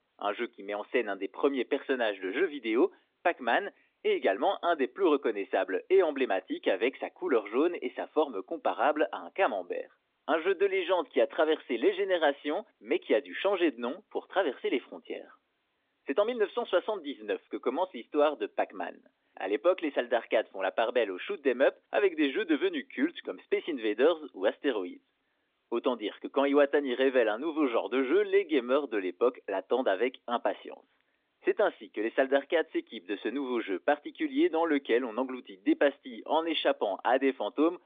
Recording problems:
phone-call audio

